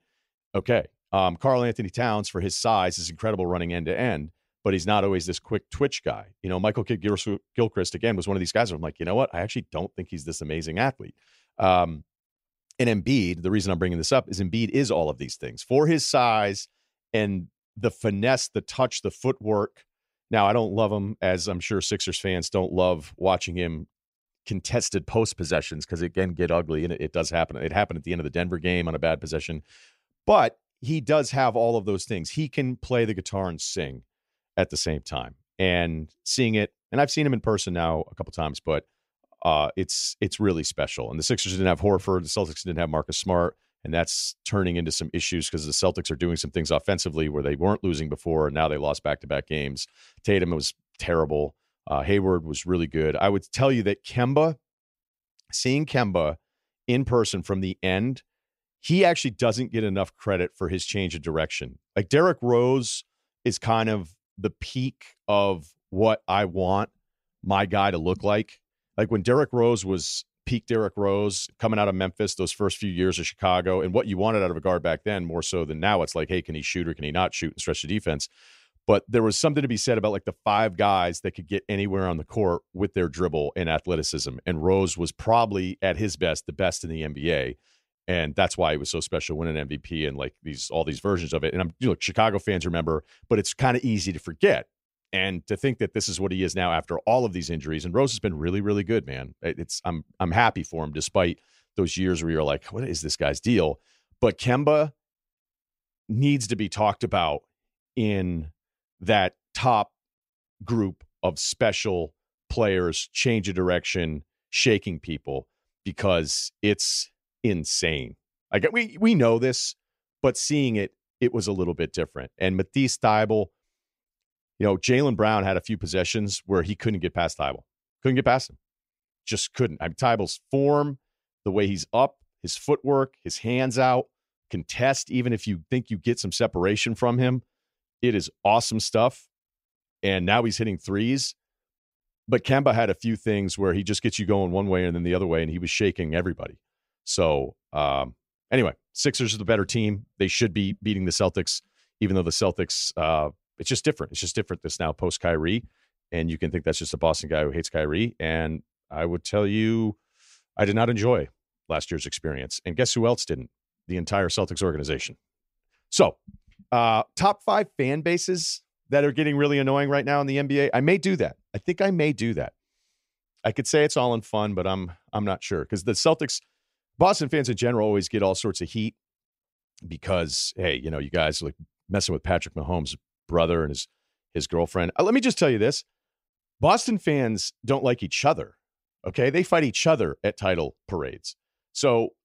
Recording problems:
none

